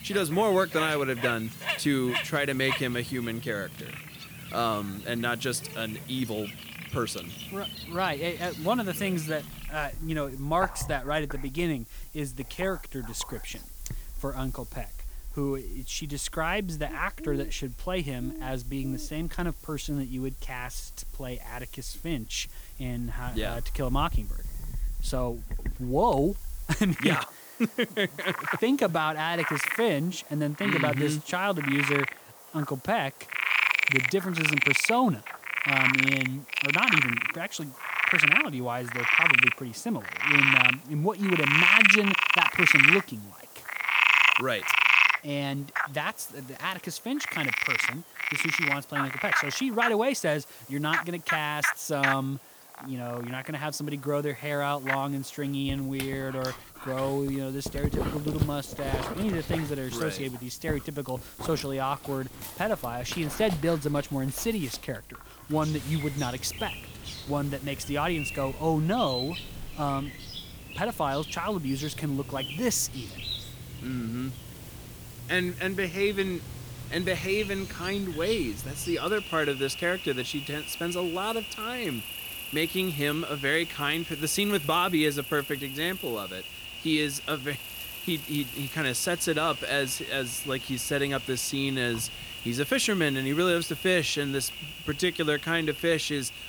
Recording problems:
animal sounds; very loud; throughout; 2 dB above the speech
hiss; noticeable; throughout; 20 dB below the speech
crackling; faint; from 1:28 to 1:29; 20 dB below the speech

